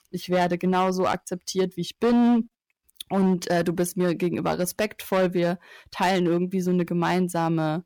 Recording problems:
distortion; slight; 8% of the sound clipped

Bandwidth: 19 kHz